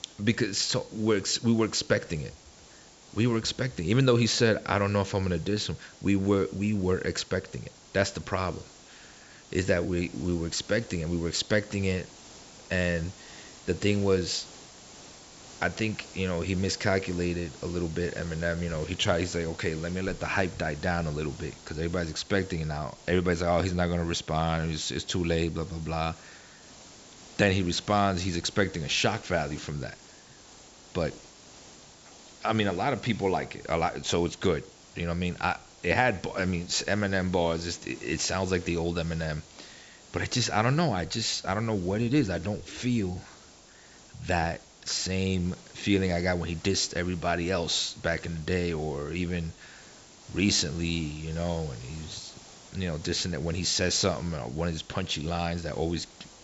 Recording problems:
high frequencies cut off; noticeable; nothing above 8 kHz
hiss; faint; throughout; 20 dB below the speech

